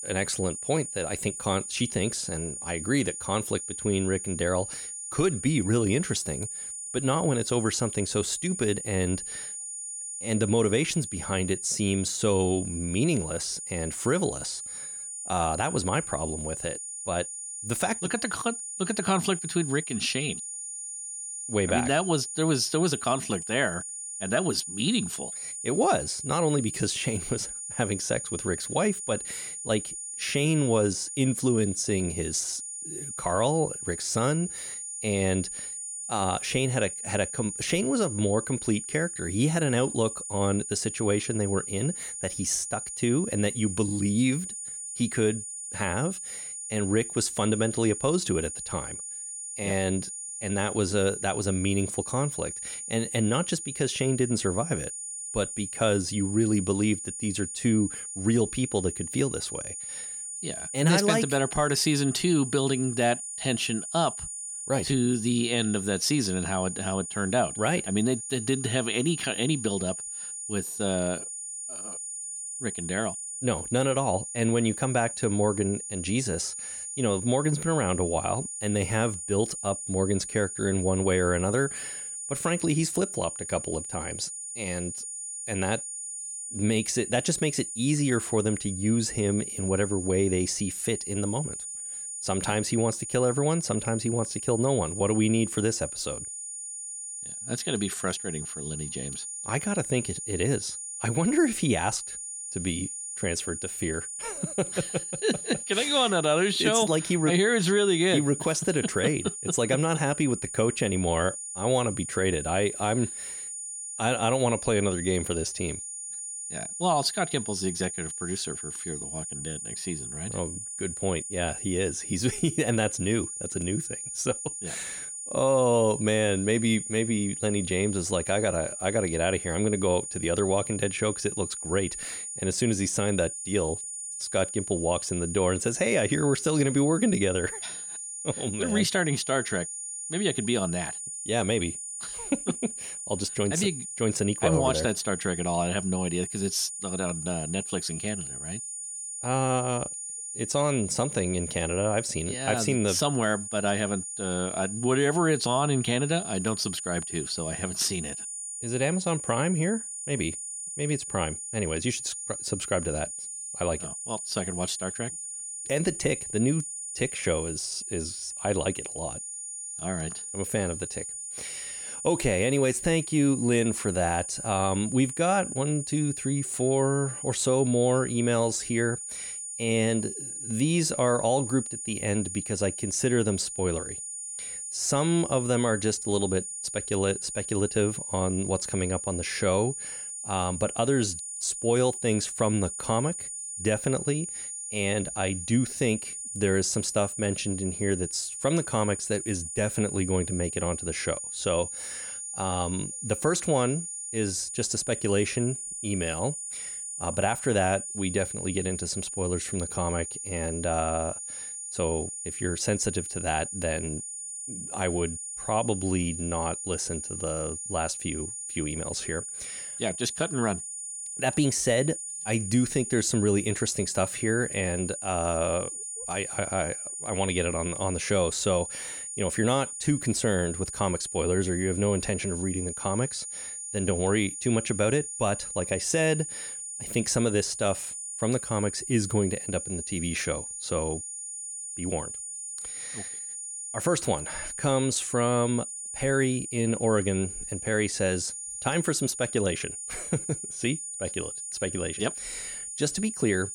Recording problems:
high-pitched whine; loud; throughout; 9.5 kHz, 6 dB below the speech

